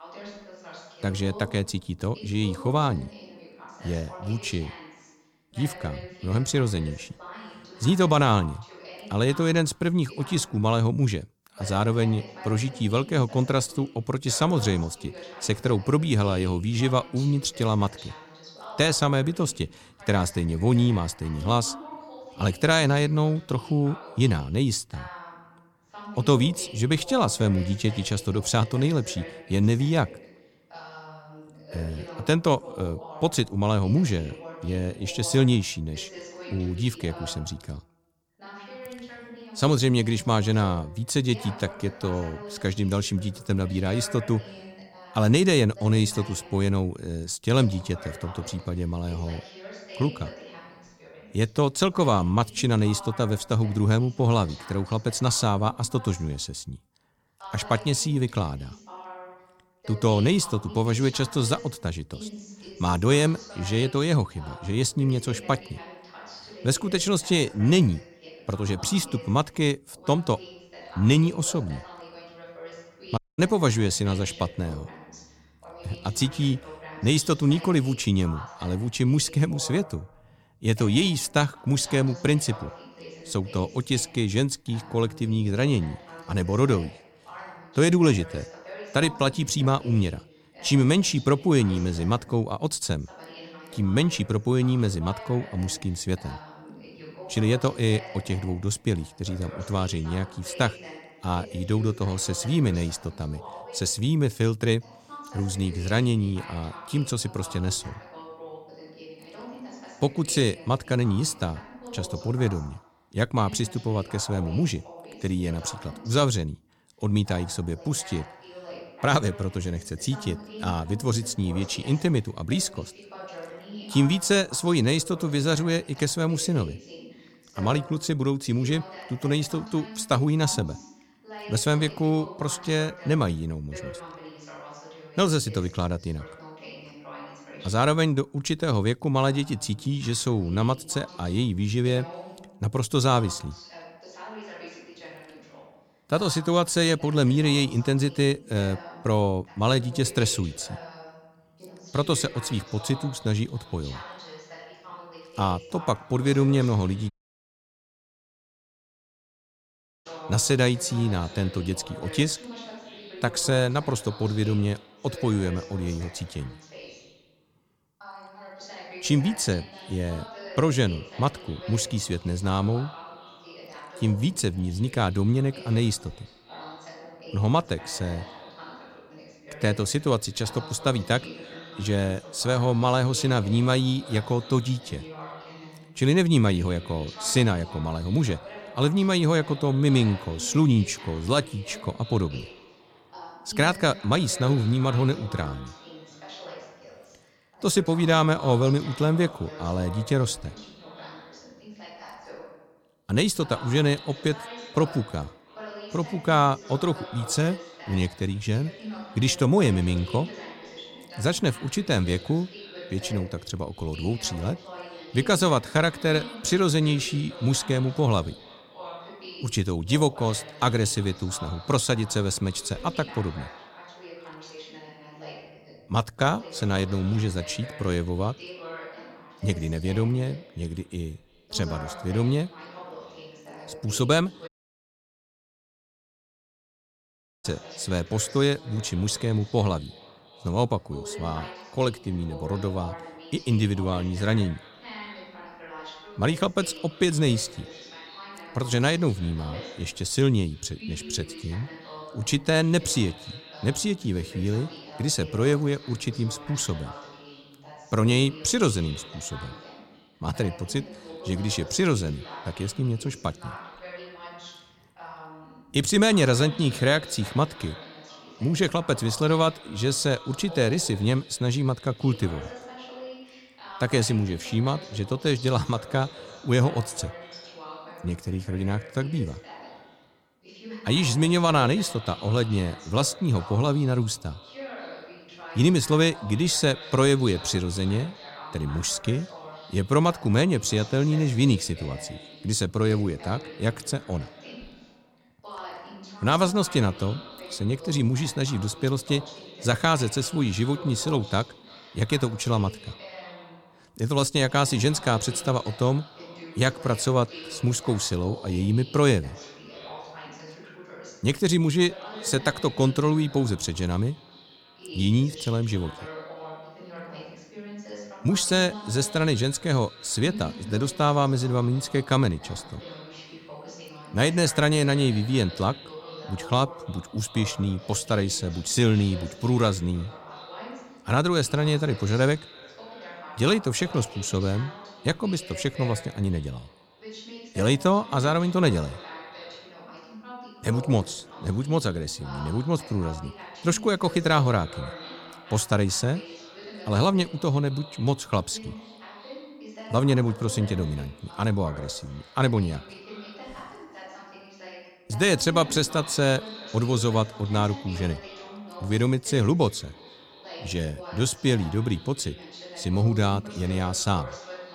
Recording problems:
echo of what is said; faint; from 2:32 on; 330 ms later, 20 dB below the speech
voice in the background; noticeable; throughout; 15 dB below the speech
audio cutting out; at 1:13, at 2:37 for 3 s and at 3:54 for 3 s

